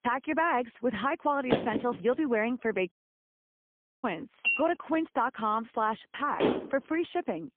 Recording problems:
phone-call audio; poor line
door banging; loud; at 1.5 s; peak 1 dB above the speech
audio cutting out; at 3 s for 1 s
clattering dishes; loud; at 4.5 s and at 6.5 s; peak 3 dB above the speech

